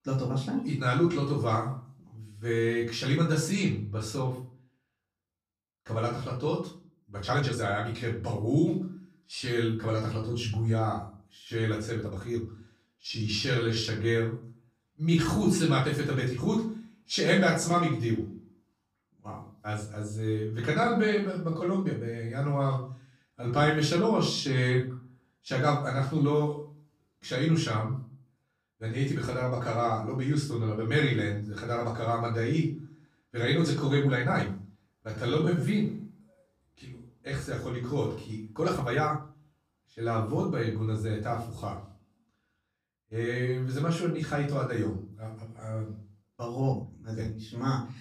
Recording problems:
off-mic speech; far
room echo; slight; dies away in 0.4 s
uneven, jittery; strongly; from 7.5 to 47 s

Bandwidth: 15 kHz